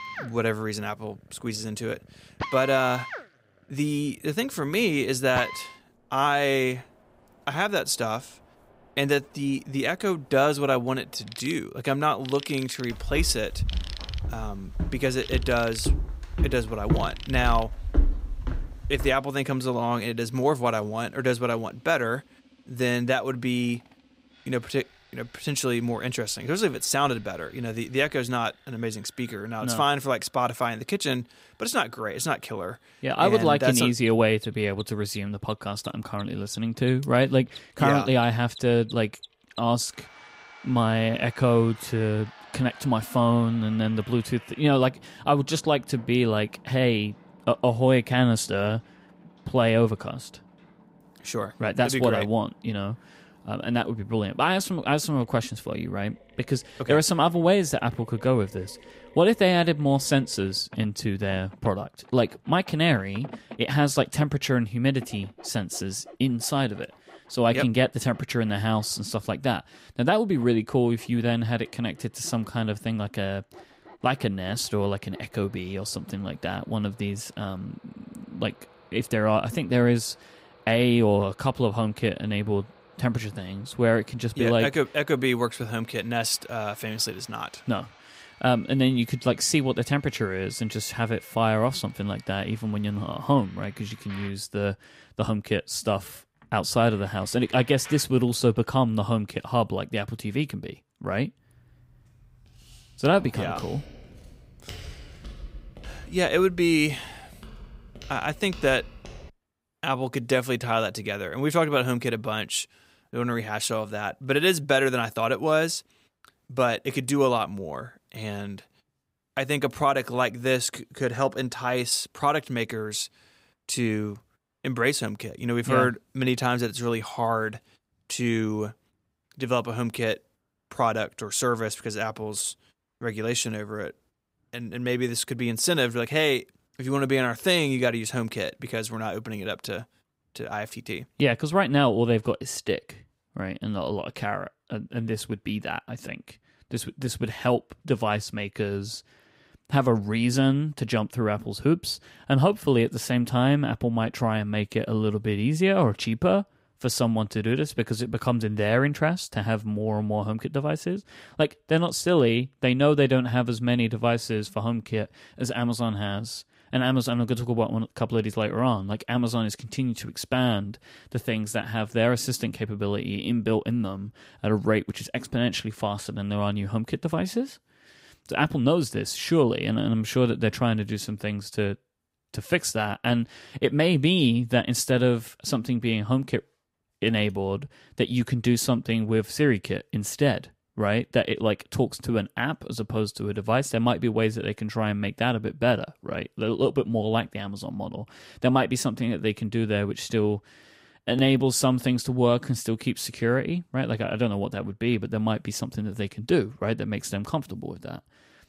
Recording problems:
machinery noise; faint; until 1:39; 20 dB below the speech
footsteps; noticeable; from 13 to 19 s; peak 1 dB below the speech
footsteps; faint; from 1:42 to 1:49; peak 15 dB below the speech

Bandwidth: 15.5 kHz